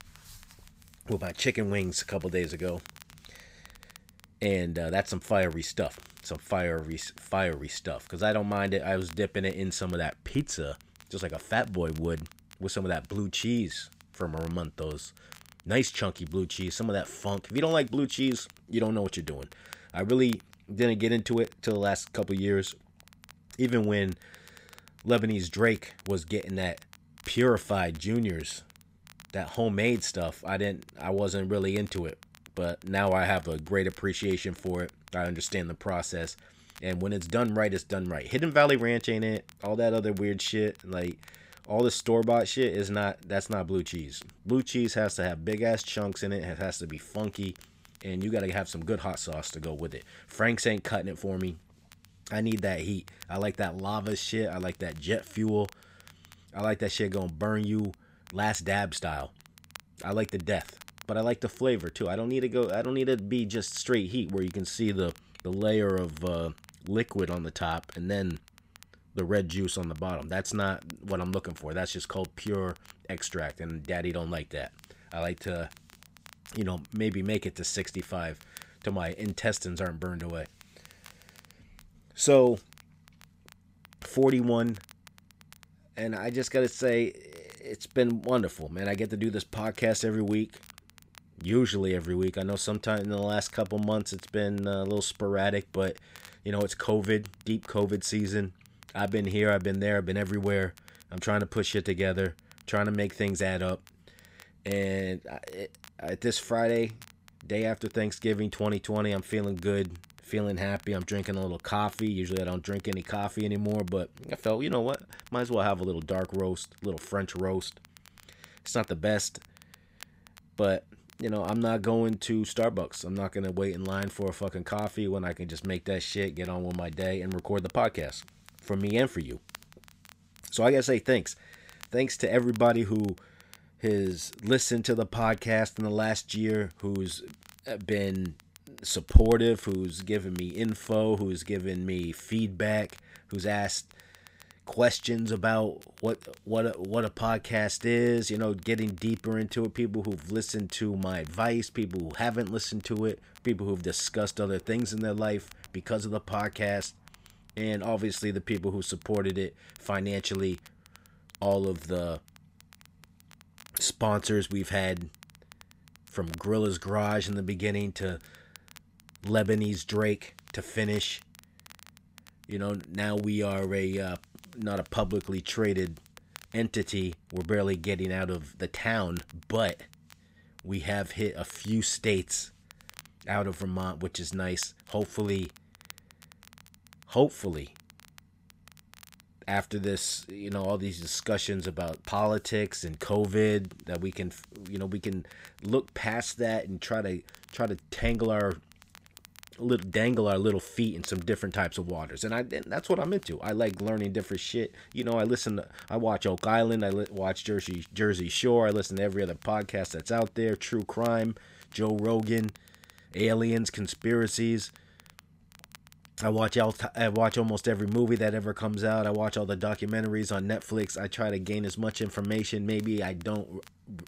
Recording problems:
crackle, like an old record; faint; 25 dB below the speech

